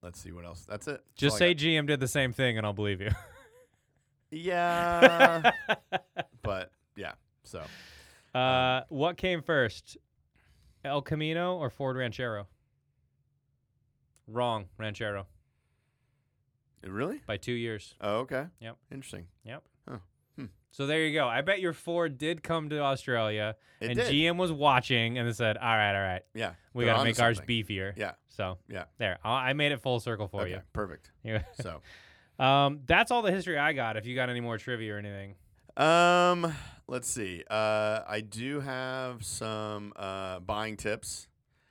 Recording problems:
none

